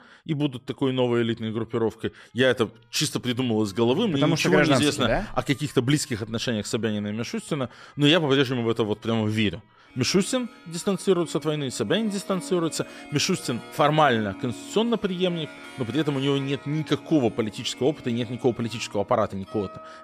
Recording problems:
background music; noticeable; throughout; 20 dB below the speech

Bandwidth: 14.5 kHz